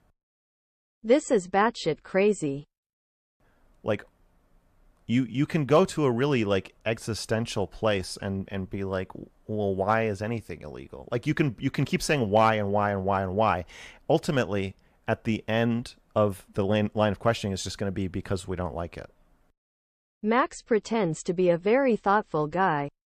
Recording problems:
none

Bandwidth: 14.5 kHz